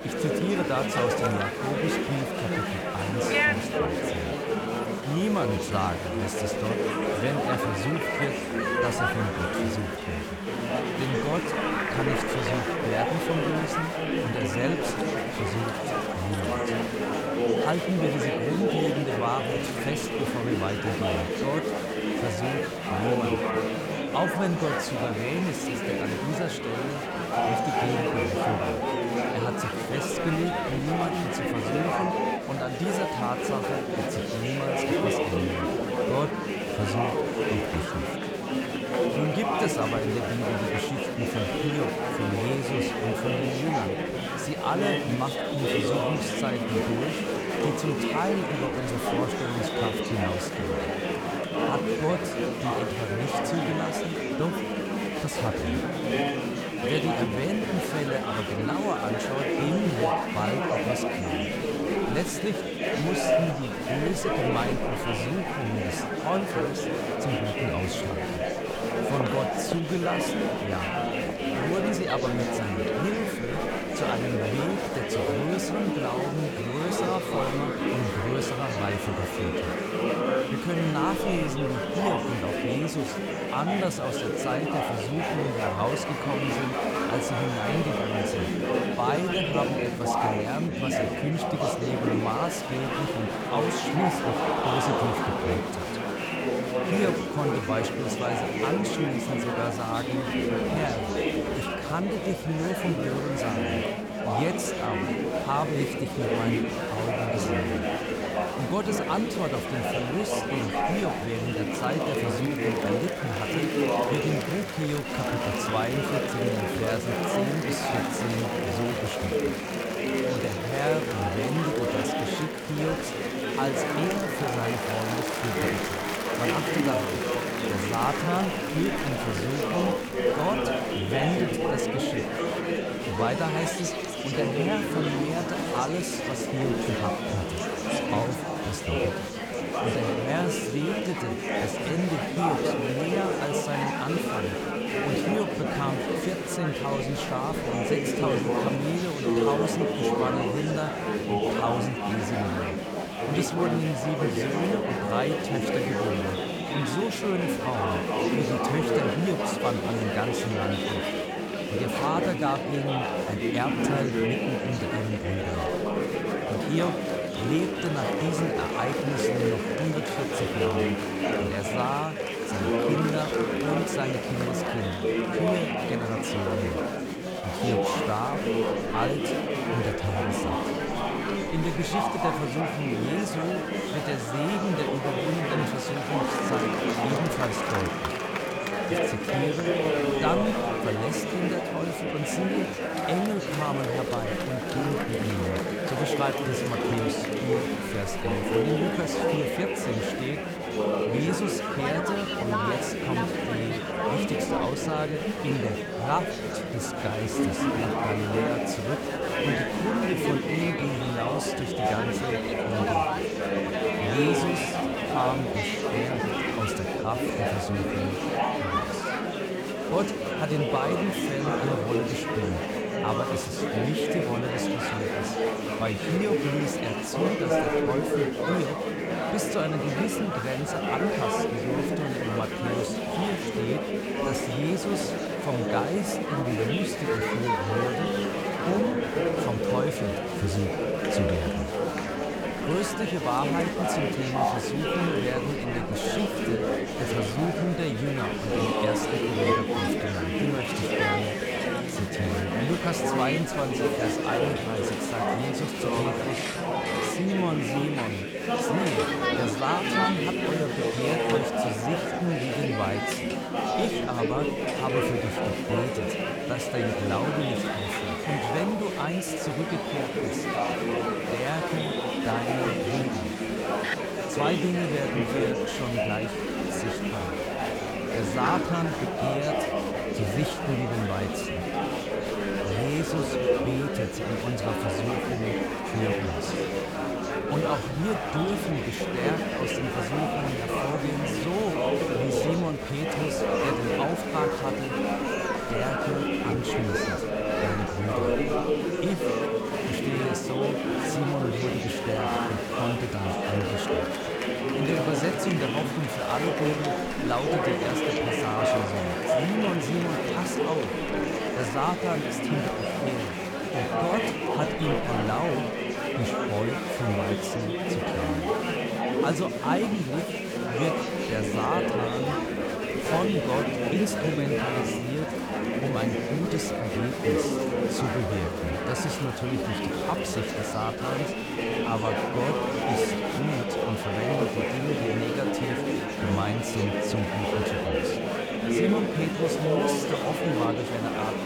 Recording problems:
murmuring crowd; very loud; throughout; 4 dB above the speech

